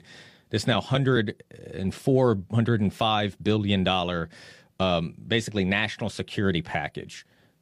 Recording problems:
none

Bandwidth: 15 kHz